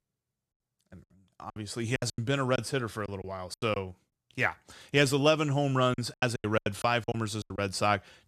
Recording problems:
choppy; very; 14% of the speech affected

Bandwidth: 14 kHz